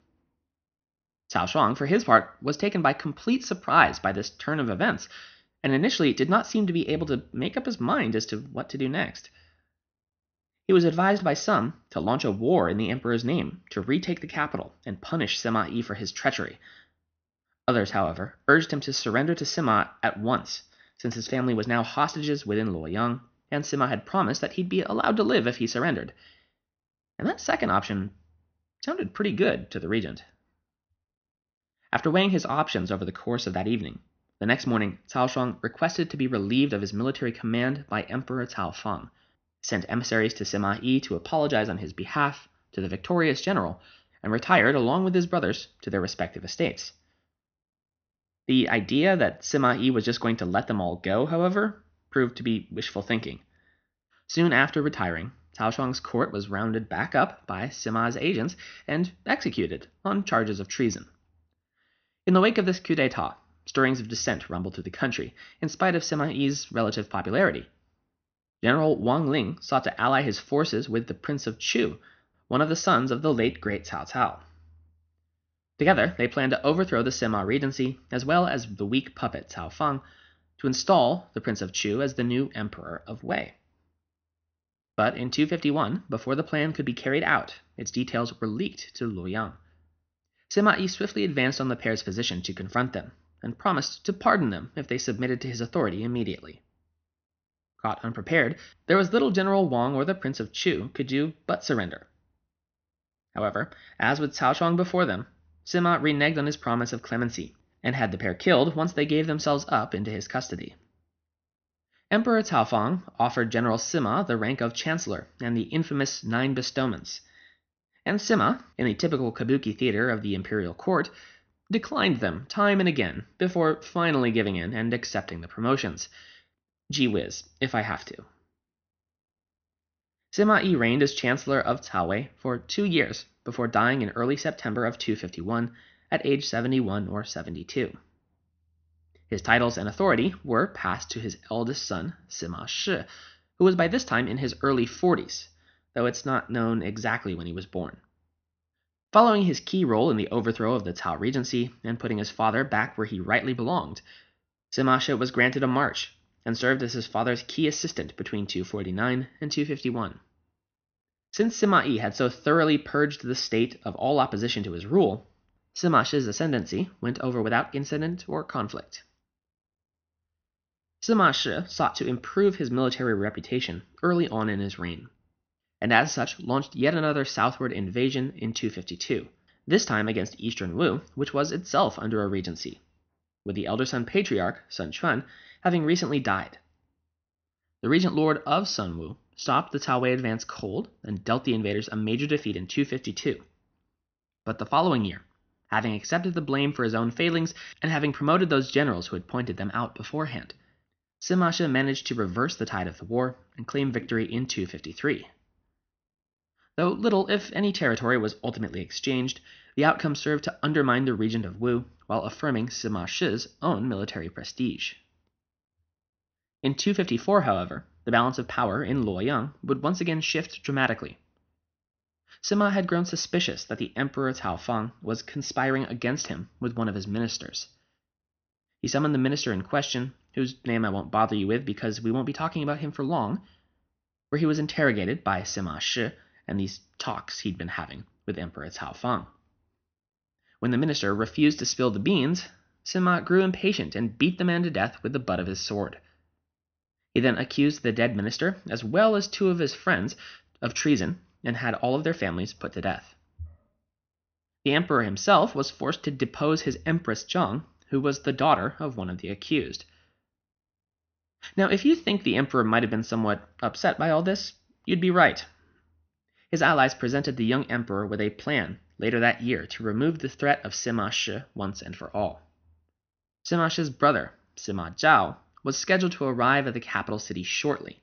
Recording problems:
high frequencies cut off; noticeable; nothing above 6 kHz

